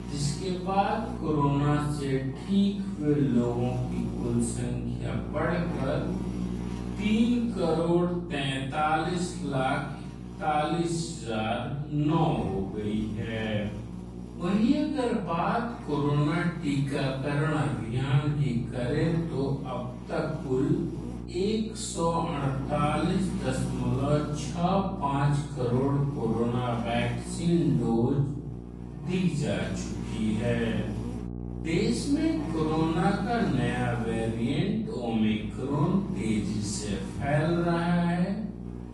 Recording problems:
off-mic speech; far
wrong speed, natural pitch; too slow; 0.5 times normal speed
room echo; noticeable; dies away in 0.7 s
garbled, watery; slightly; nothing above 10 kHz
electrical hum; noticeable; throughout; 60 Hz, 15 dB below the speech

